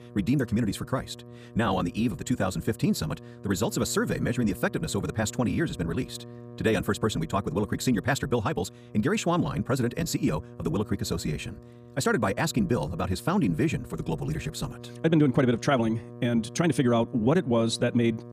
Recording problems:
wrong speed, natural pitch; too fast; 1.6 times normal speed
electrical hum; noticeable; throughout; 60 Hz, 20 dB below the speech

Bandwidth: 15 kHz